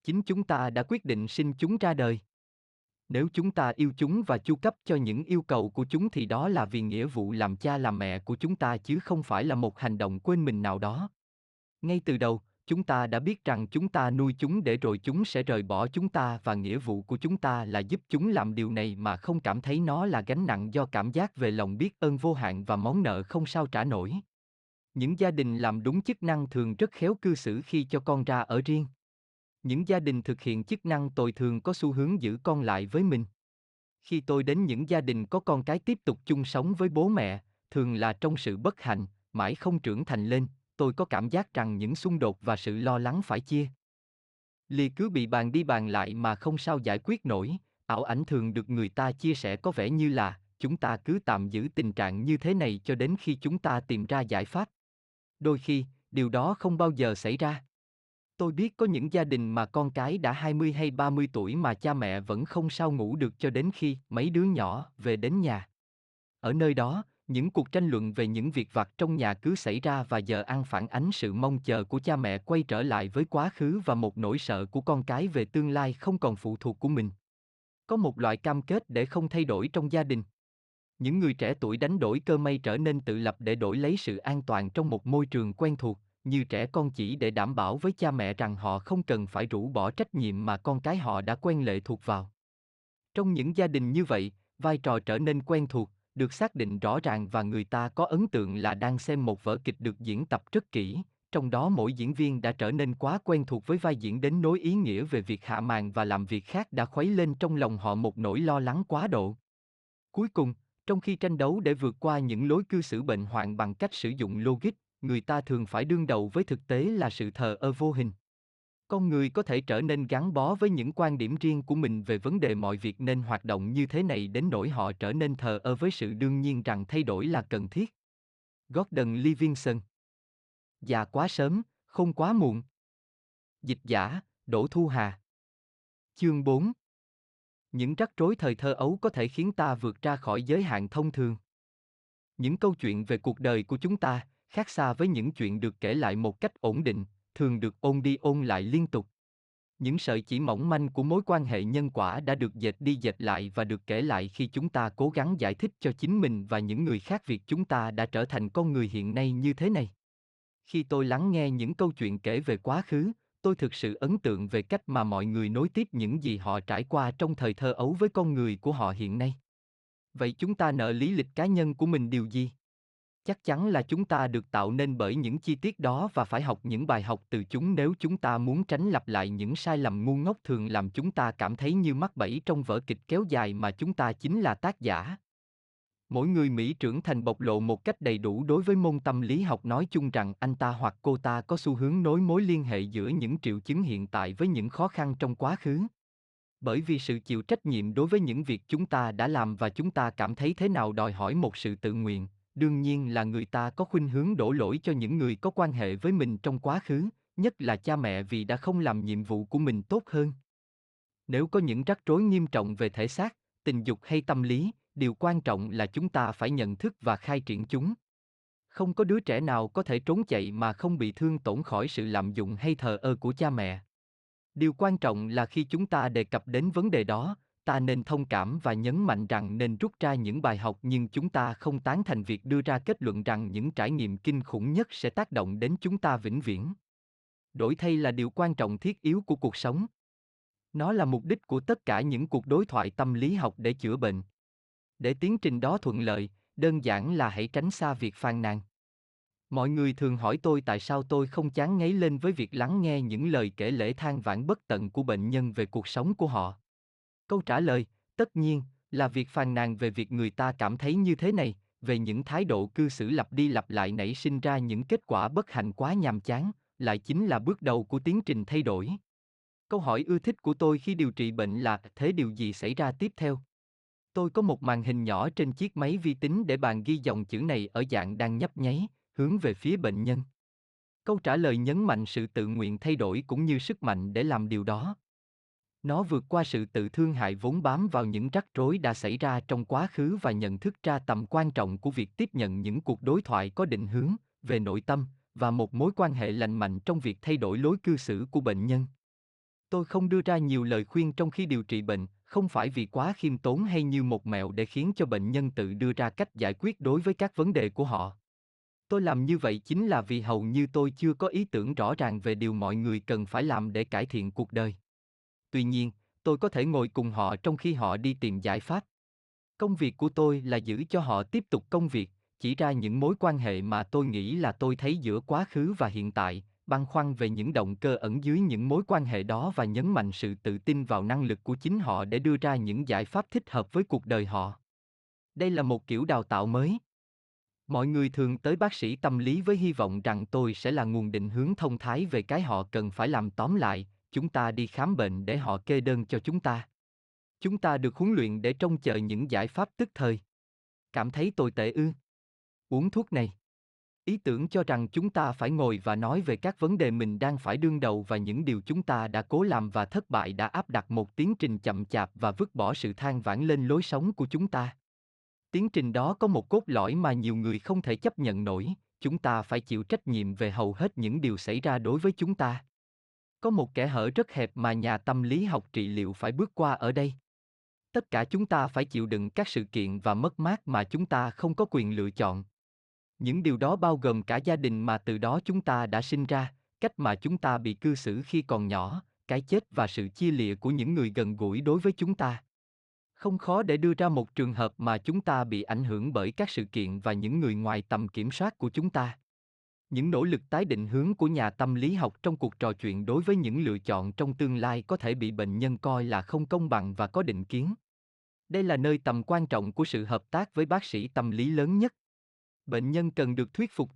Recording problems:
none

